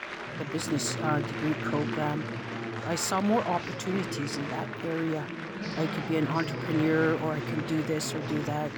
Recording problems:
chatter from many people; loud; throughout; 4 dB below the speech

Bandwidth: 18.5 kHz